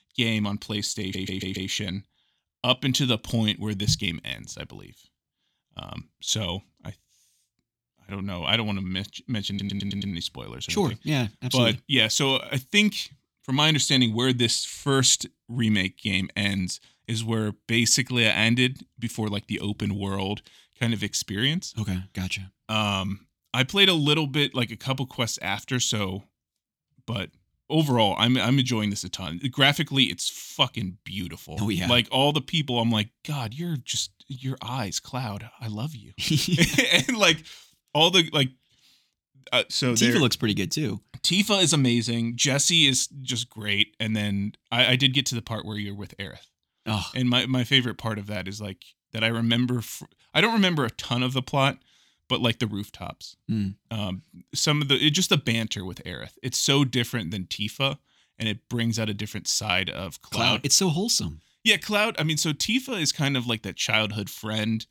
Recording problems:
audio stuttering; at 1 s and at 9.5 s

